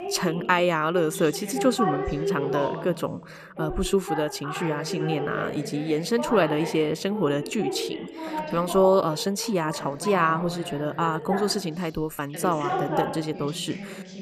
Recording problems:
background chatter; loud; throughout; 2 voices, 7 dB below the speech

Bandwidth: 14.5 kHz